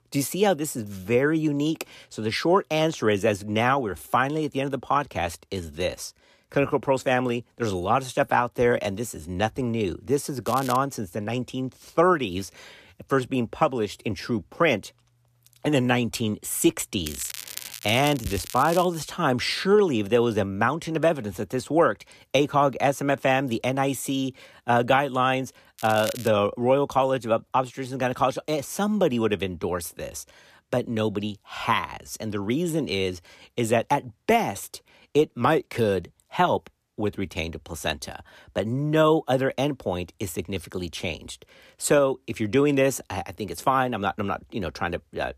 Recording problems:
crackling; noticeable; at 10 s, from 17 to 19 s and at 26 s; 10 dB below the speech

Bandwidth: 14.5 kHz